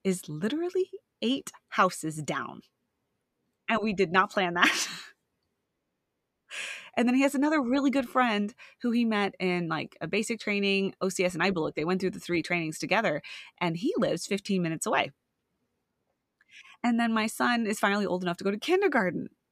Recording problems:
none

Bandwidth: 14.5 kHz